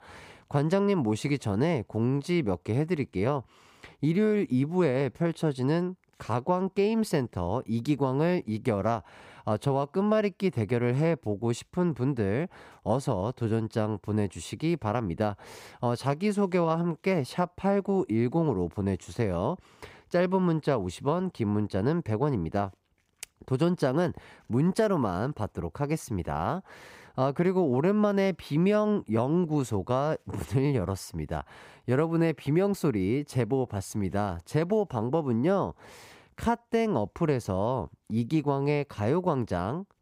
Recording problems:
none

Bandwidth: 15.5 kHz